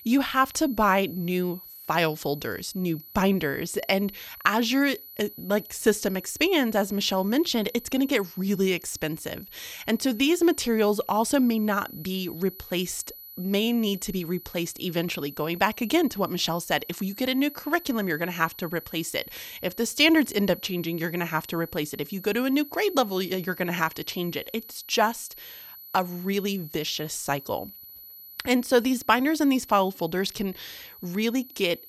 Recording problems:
high-pitched whine; noticeable; throughout; 12 kHz, 15 dB below the speech

